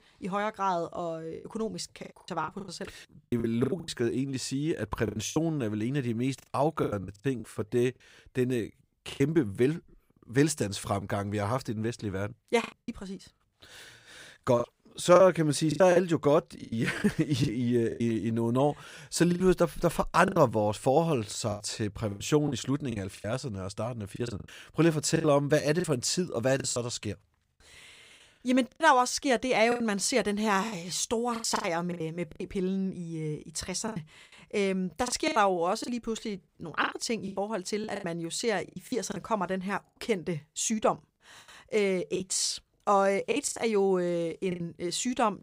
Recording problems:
choppy; very; 11% of the speech affected

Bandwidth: 15.5 kHz